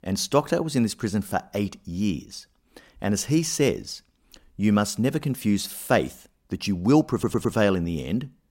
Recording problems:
audio stuttering; at 7 s

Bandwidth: 16 kHz